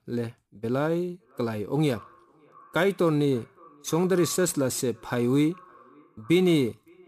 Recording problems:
echo of what is said; faint; throughout; 560 ms later, 25 dB below the speech

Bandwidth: 15 kHz